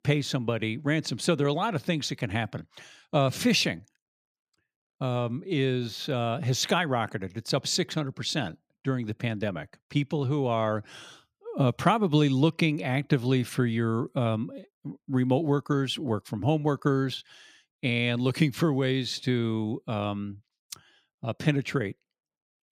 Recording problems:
none

